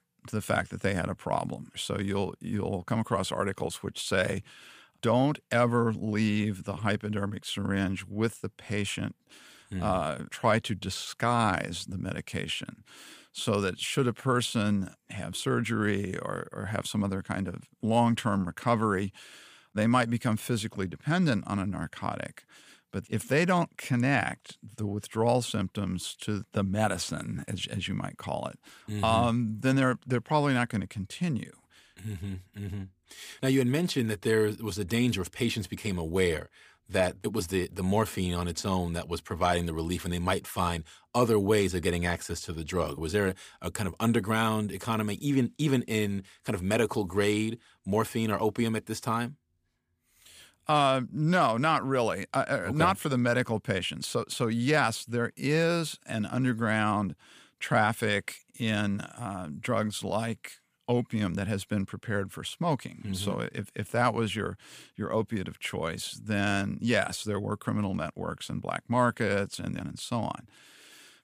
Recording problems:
none

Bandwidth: 15 kHz